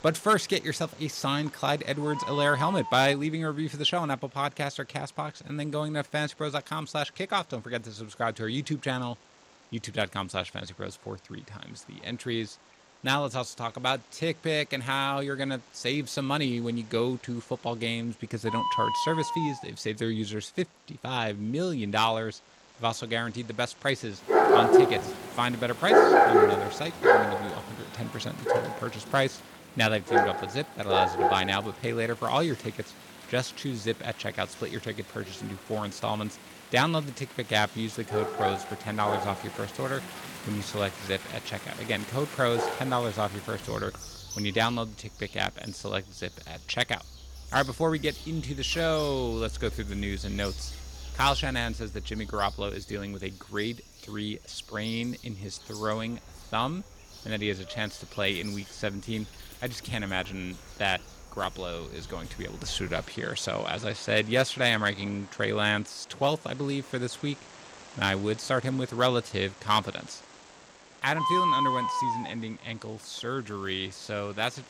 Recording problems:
animal sounds; very loud; throughout; 2 dB above the speech

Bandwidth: 17 kHz